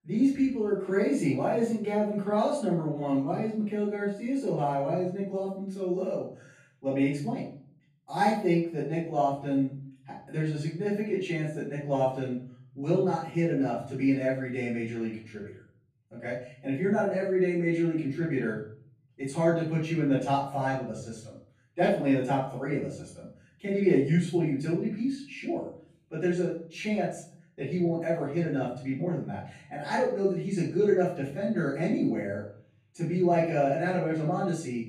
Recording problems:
off-mic speech; far
room echo; noticeable; dies away in 0.6 s

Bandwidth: 15 kHz